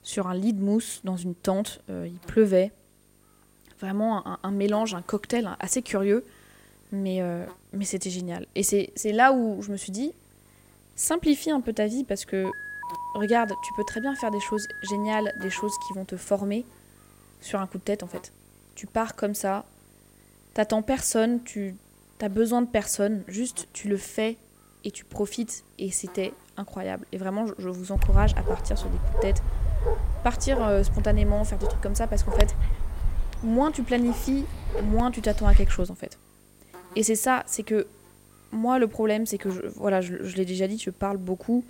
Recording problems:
electrical hum; faint; throughout; 50 Hz, 25 dB below the speech
alarm; noticeable; from 12 to 16 s; peak 7 dB below the speech
dog barking; loud; from 28 to 36 s; peak 4 dB above the speech

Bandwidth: 16 kHz